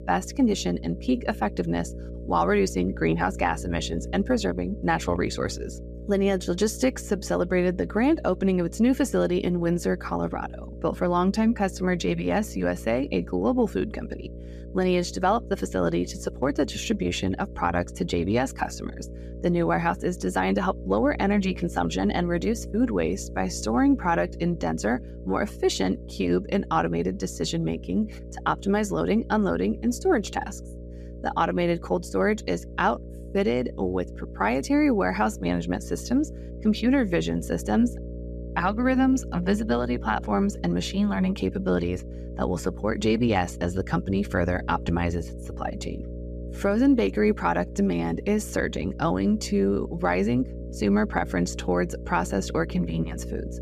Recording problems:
electrical hum; noticeable; throughout; 60 Hz, 20 dB below the speech

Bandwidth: 14.5 kHz